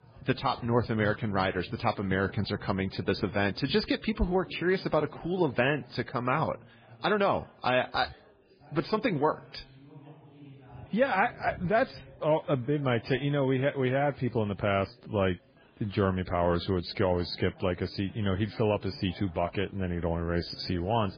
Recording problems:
garbled, watery; badly
chatter from many people; faint; throughout; 25 dB below the speech

